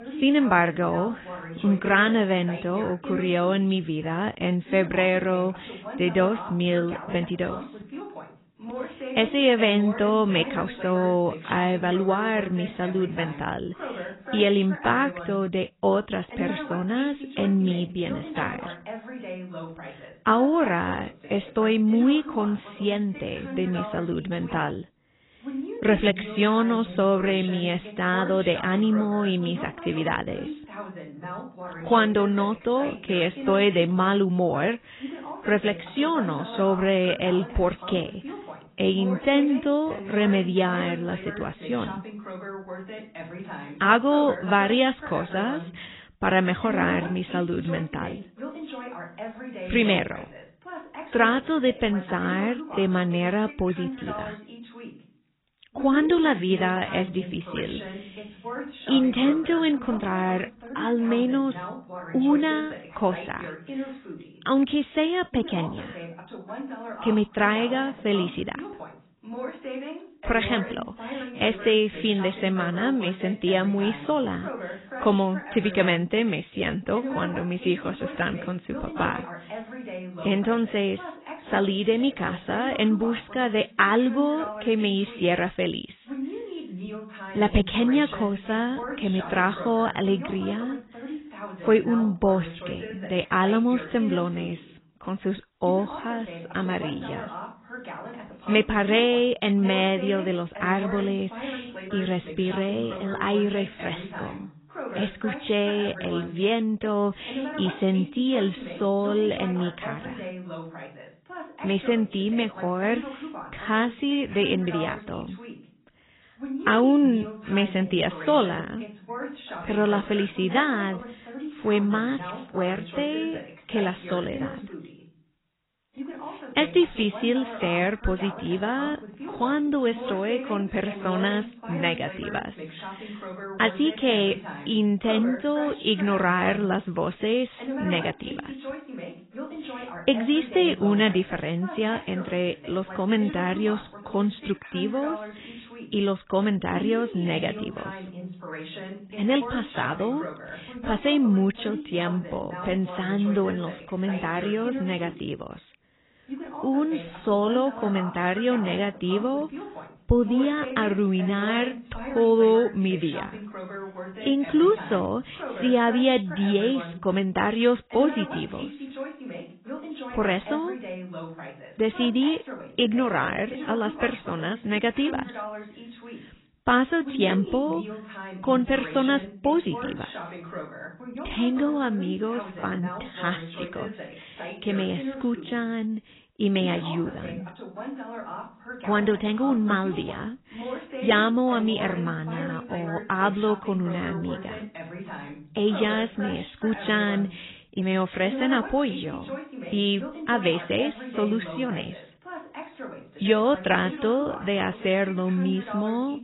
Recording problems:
garbled, watery; badly; nothing above 3.5 kHz
voice in the background; noticeable; throughout; 15 dB below the speech

